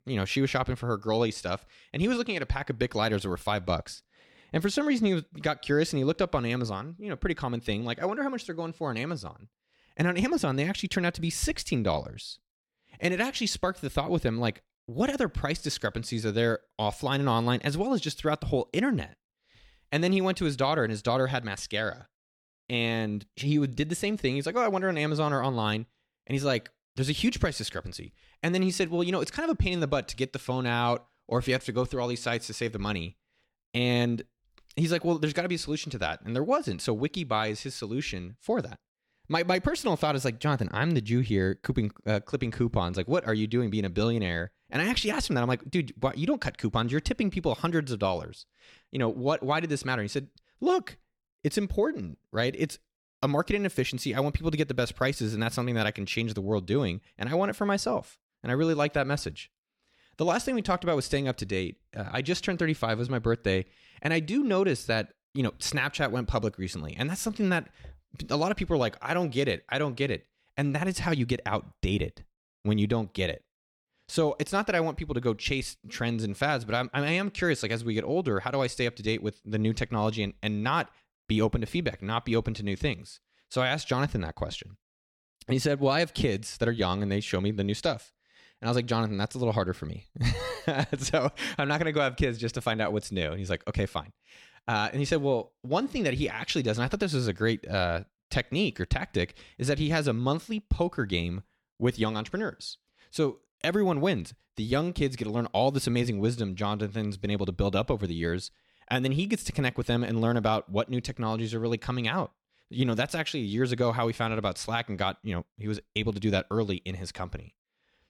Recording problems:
none

